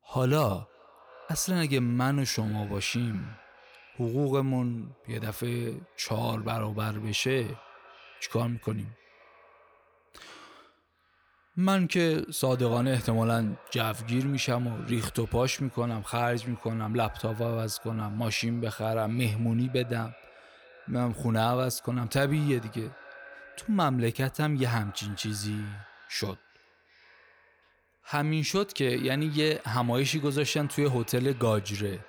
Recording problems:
echo of what is said; faint; throughout; 370 ms later, 20 dB below the speech

